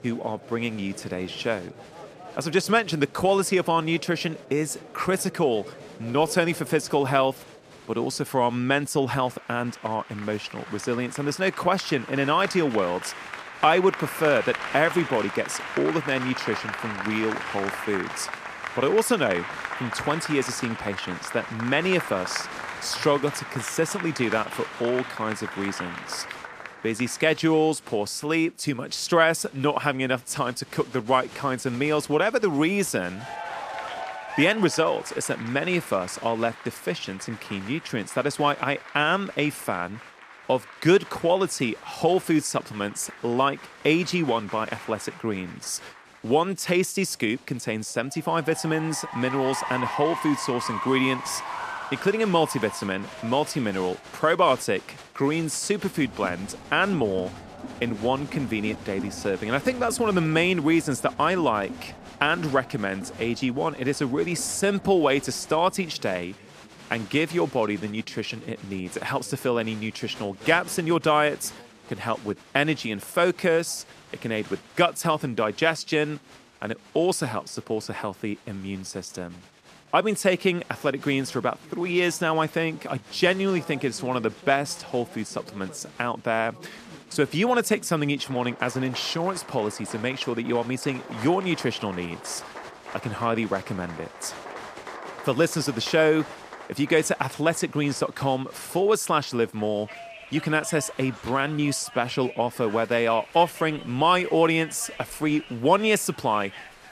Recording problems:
crowd noise; noticeable; throughout; 15 dB below the speech

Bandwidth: 14.5 kHz